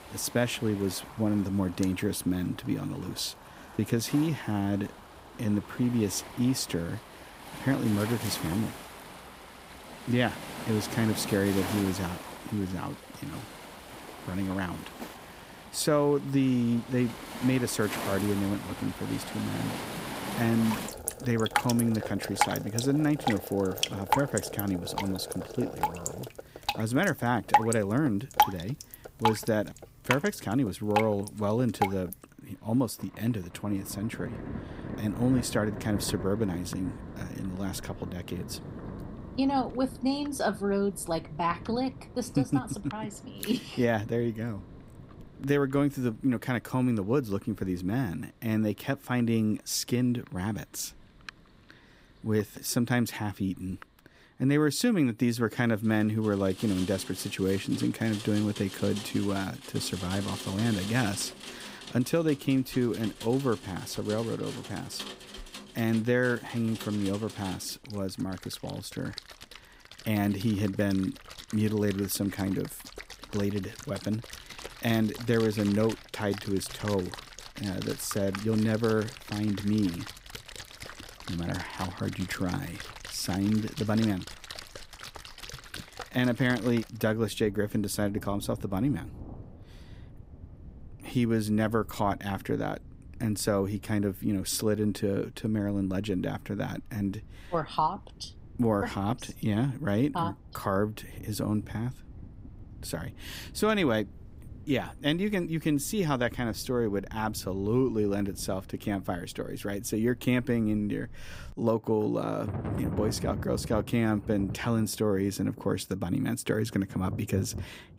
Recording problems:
rain or running water; loud; throughout; 9 dB below the speech

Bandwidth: 15.5 kHz